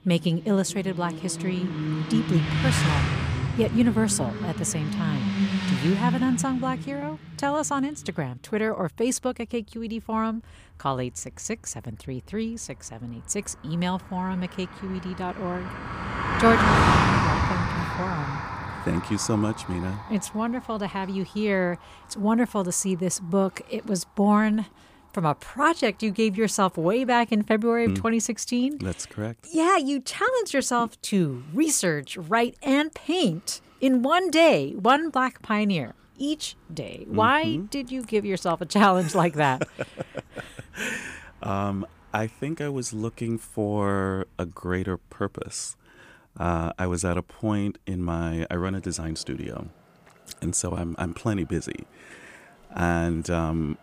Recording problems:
traffic noise; loud; throughout; 1 dB below the speech

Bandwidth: 15 kHz